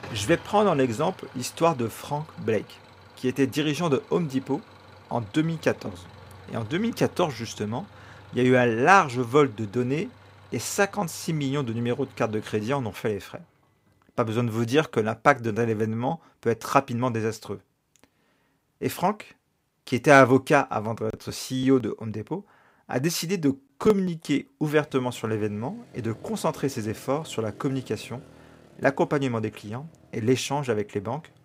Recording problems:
traffic noise; faint; throughout; 25 dB below the speech

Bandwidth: 15.5 kHz